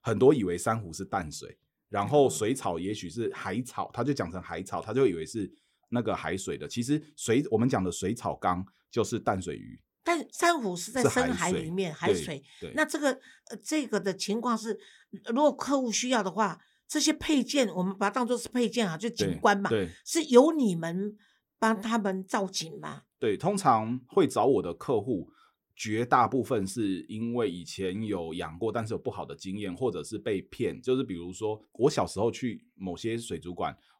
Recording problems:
none

